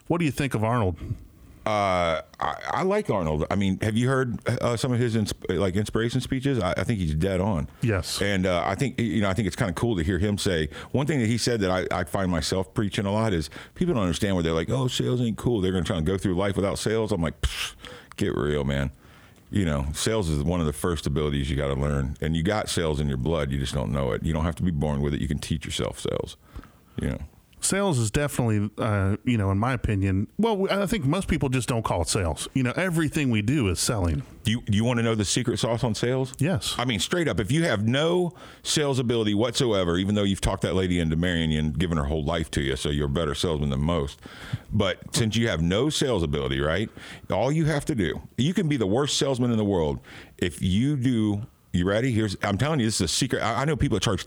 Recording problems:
squashed, flat; somewhat

